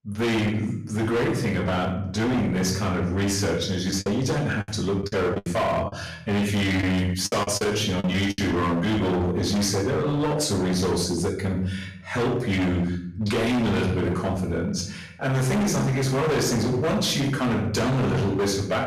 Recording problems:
distortion; heavy; 29% of the sound clipped
off-mic speech; far
room echo; noticeable; dies away in 0.6 s
choppy; very; from 4 to 8.5 s; 13% of the speech affected

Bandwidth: 14.5 kHz